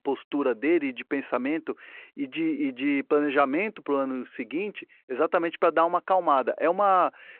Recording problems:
phone-call audio

